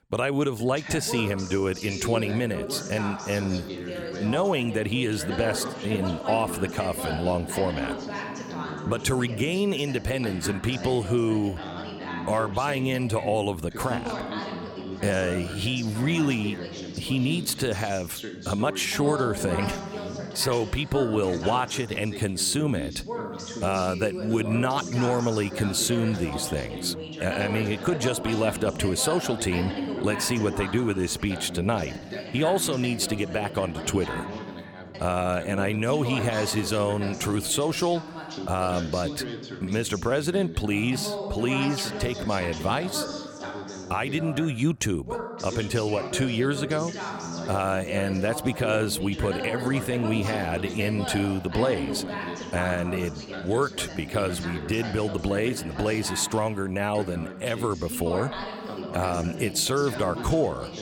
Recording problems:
background chatter; loud; throughout; 2 voices, 8 dB below the speech

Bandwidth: 17 kHz